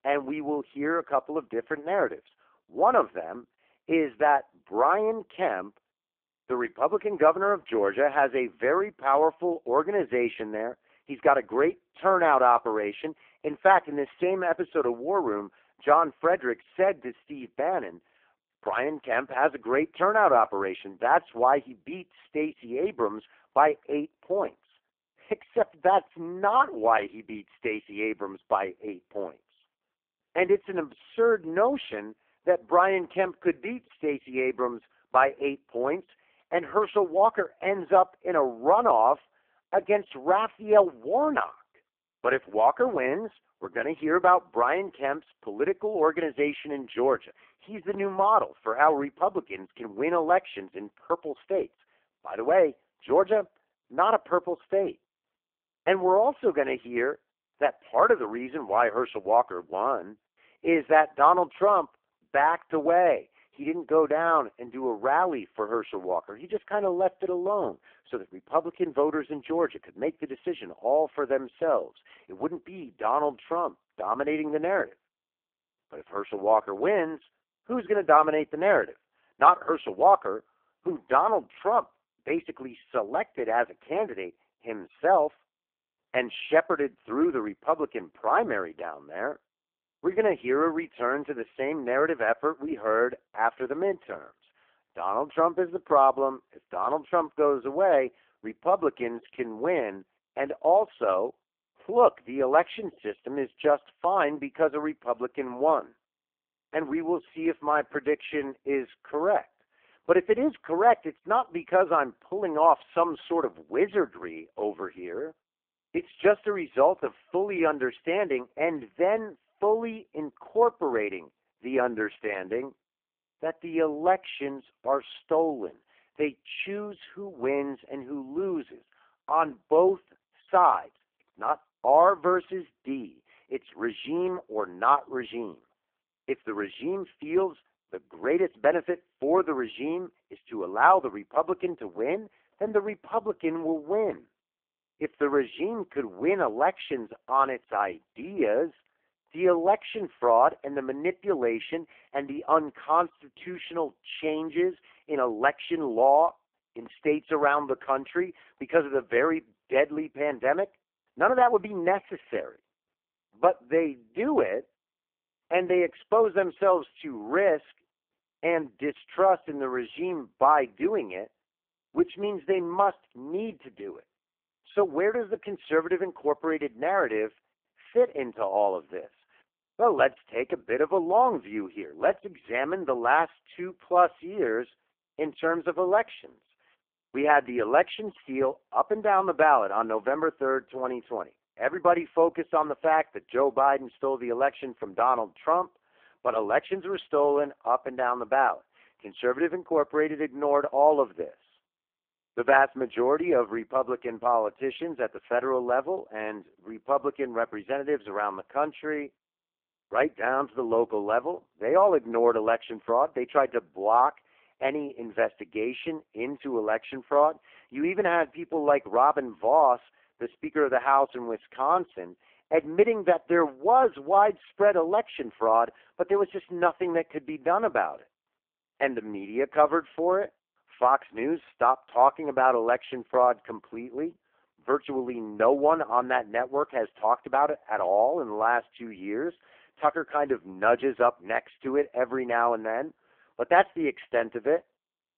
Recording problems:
phone-call audio; poor line

